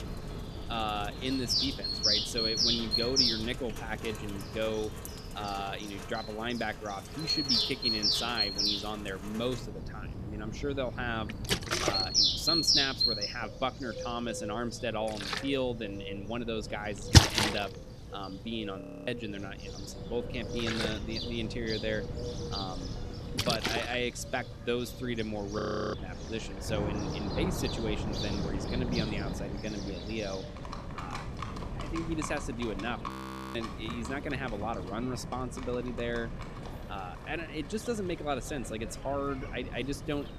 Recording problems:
animal sounds; very loud; throughout; 5 dB above the speech
rain or running water; very loud; throughout; 1 dB above the speech
wind noise on the microphone; occasional gusts; 15 dB below the speech
audio freezing; at 19 s, at 26 s and at 33 s

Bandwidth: 14 kHz